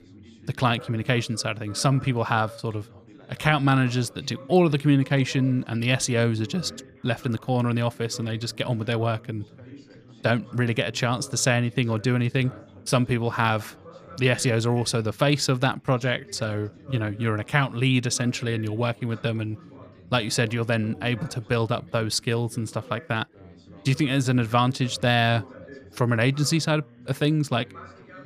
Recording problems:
background chatter; faint; throughout; 3 voices, 20 dB below the speech

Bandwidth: 15 kHz